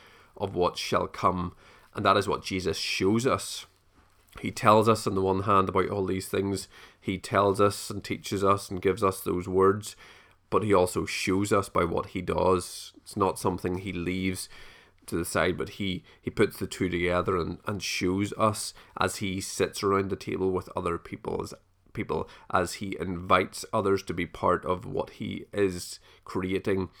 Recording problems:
none

